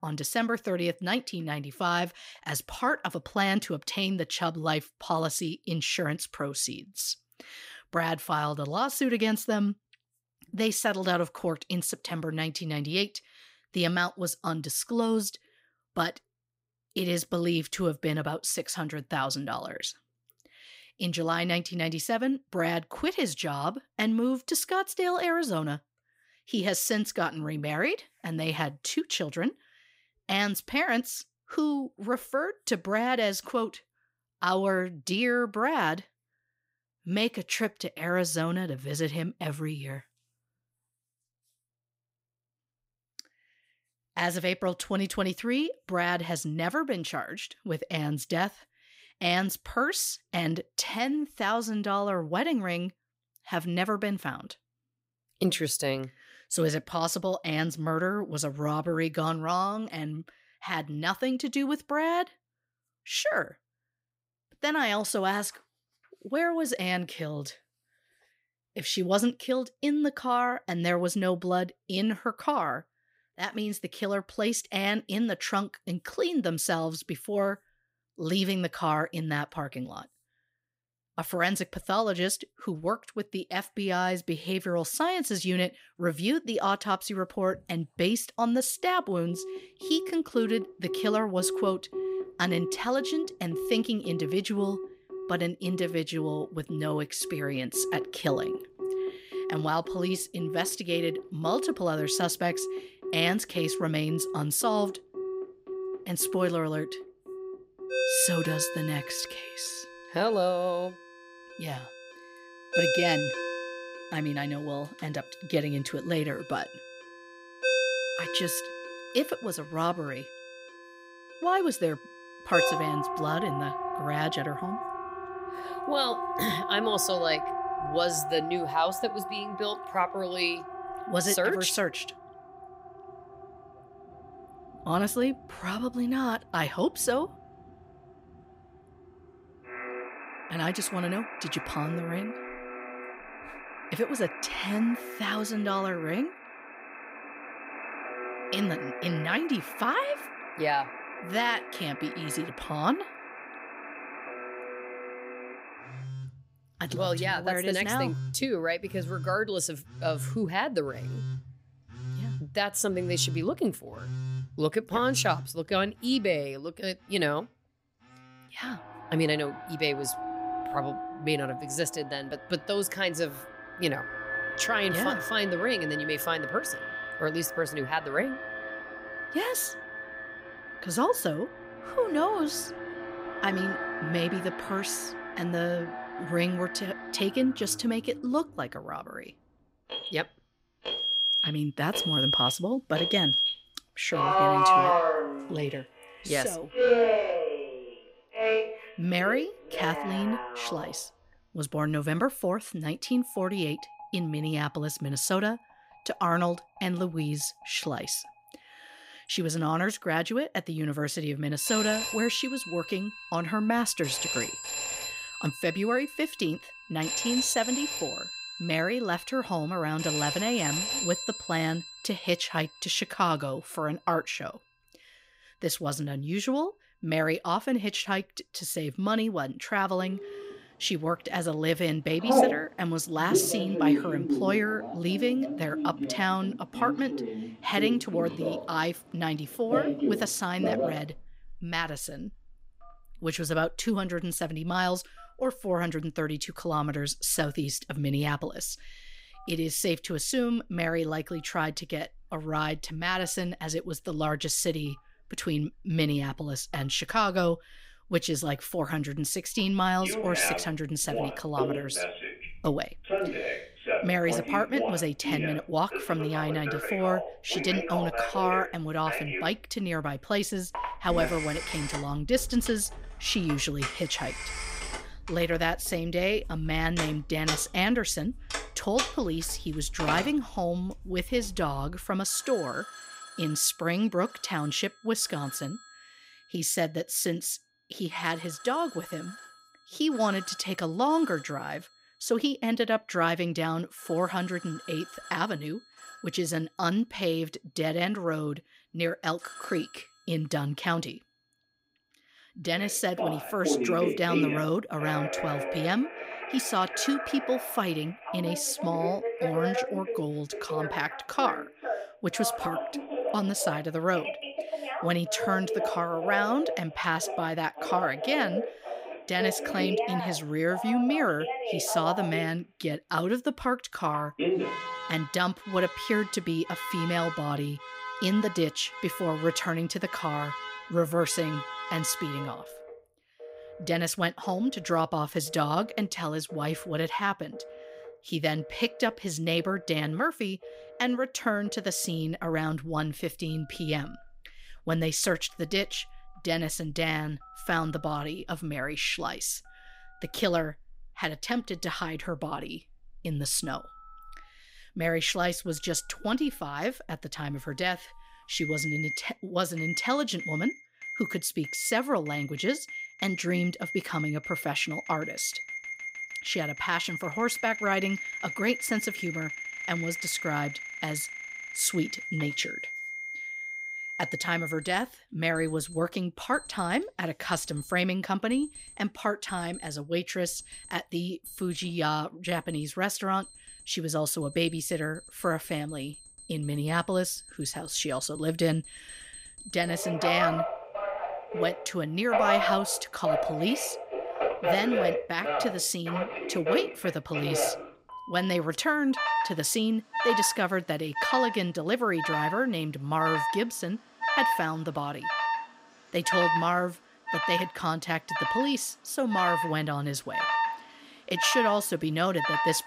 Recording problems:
alarms or sirens; loud; from 1:29 on; 4 dB below the speech

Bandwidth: 15.5 kHz